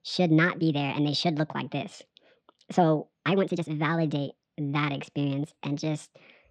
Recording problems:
wrong speed and pitch; too fast and too high; 1.5 times normal speed
muffled; slightly; fading above 4 kHz
uneven, jittery; strongly; from 1.5 to 6 s

